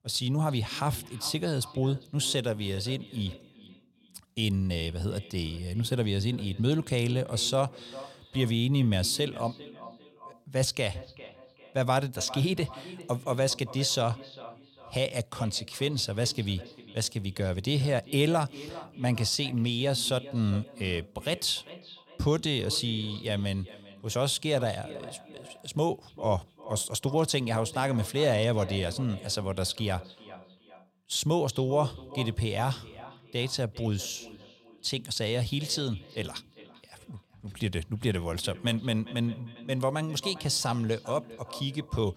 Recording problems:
echo of what is said; noticeable; throughout; 400 ms later, 20 dB below the speech

